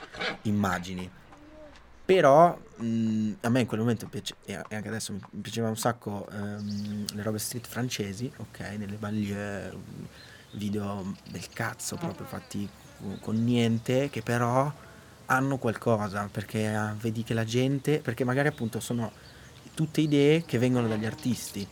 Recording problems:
animal sounds; noticeable; throughout; 20 dB below the speech

